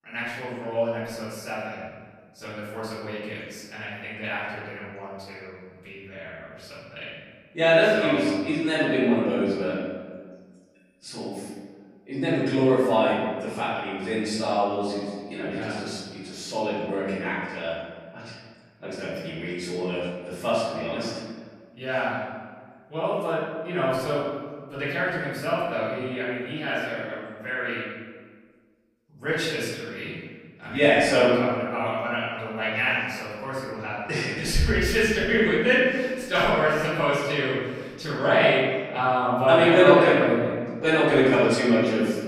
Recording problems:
room echo; strong; dies away in 1.4 s
off-mic speech; far

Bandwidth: 15.5 kHz